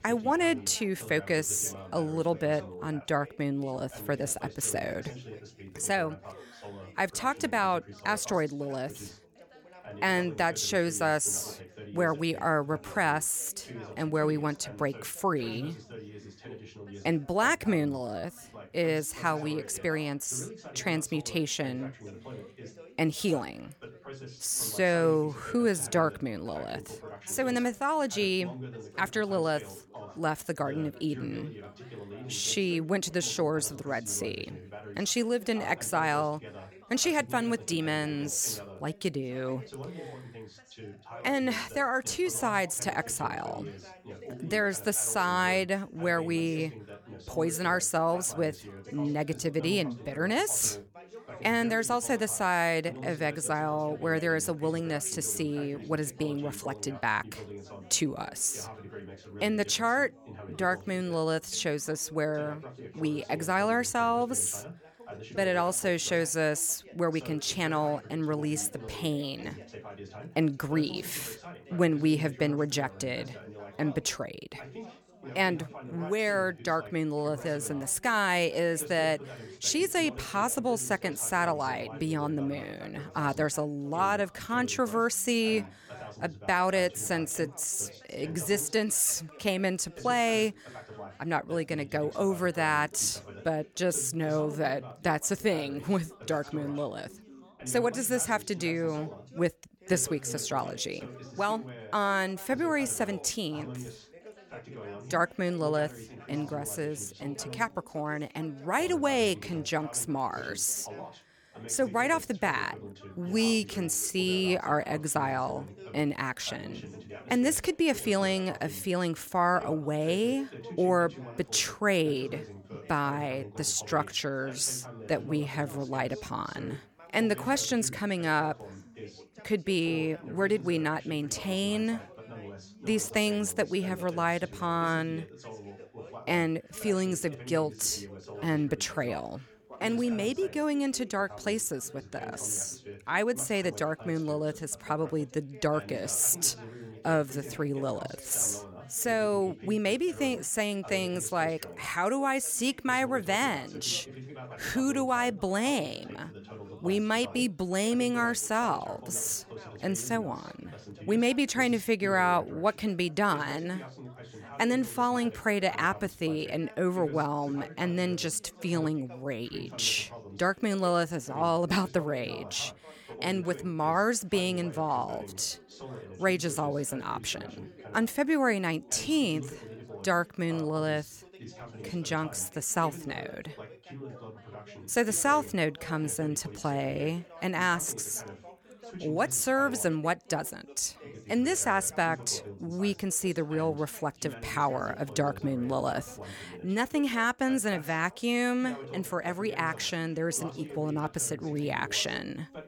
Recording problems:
background chatter; noticeable; throughout; 3 voices, 15 dB below the speech

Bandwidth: 18.5 kHz